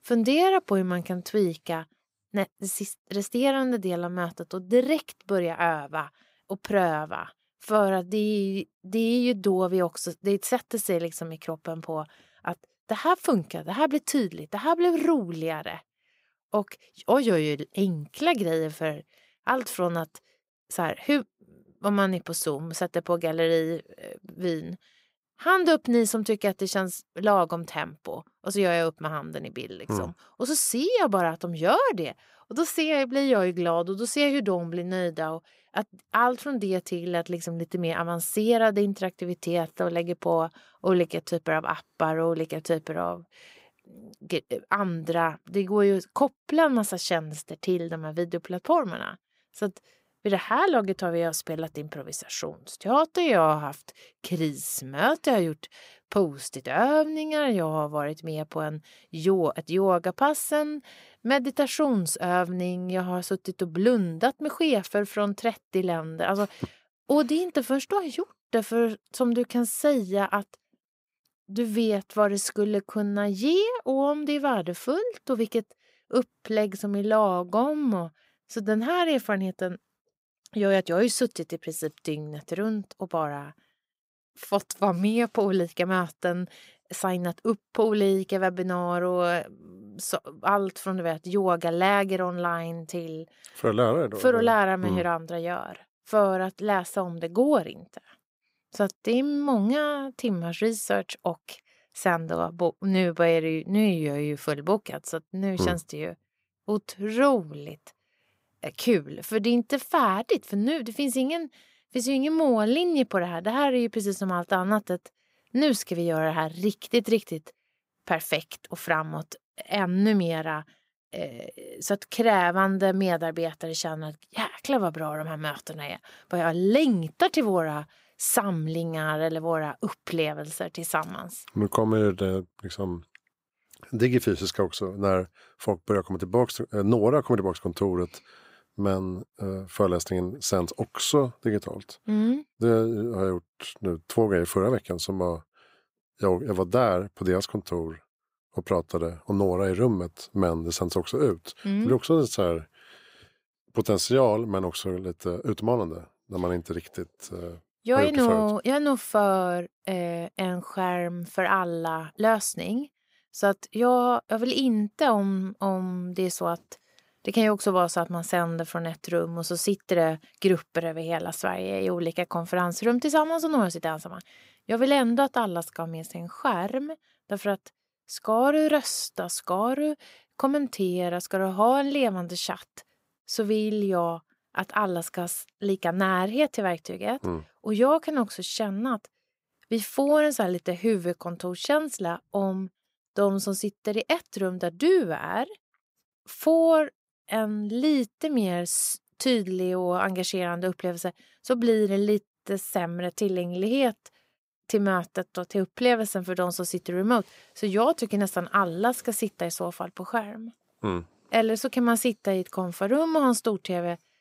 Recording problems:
none

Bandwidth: 15.5 kHz